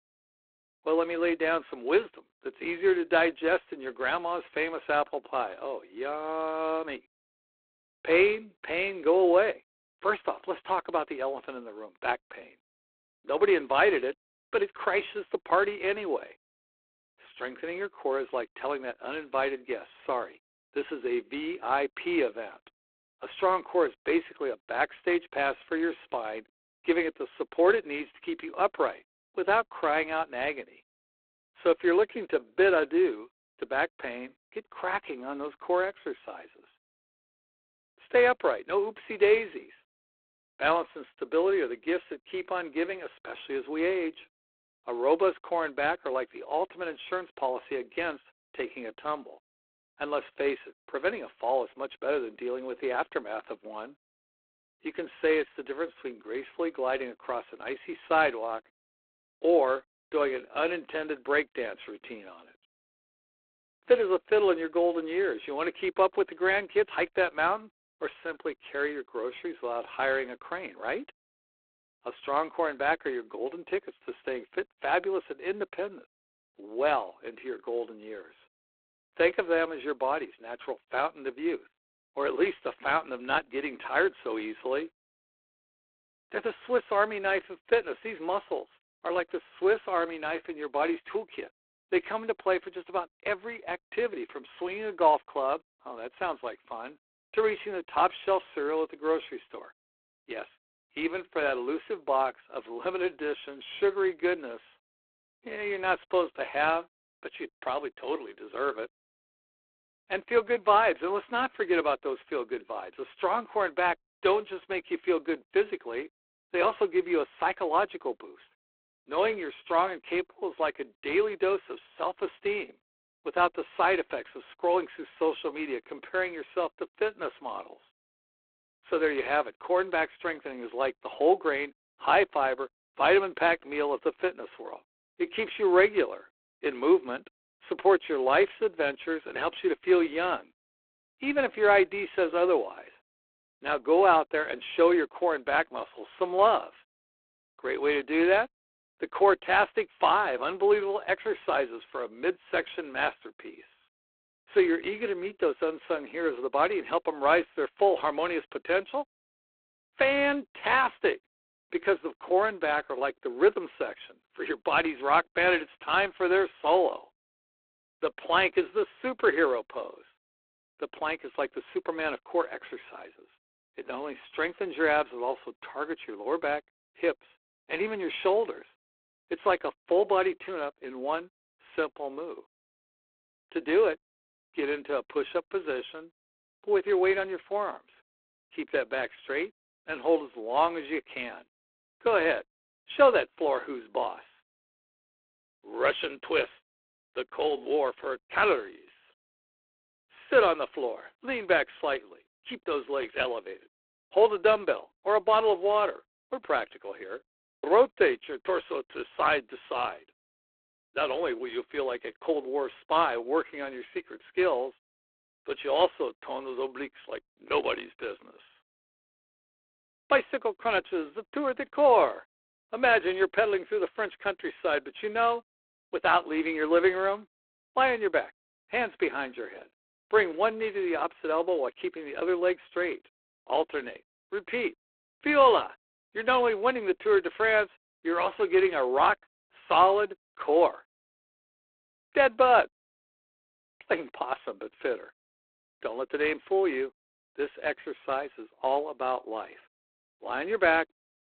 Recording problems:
phone-call audio; poor line; nothing above 4 kHz

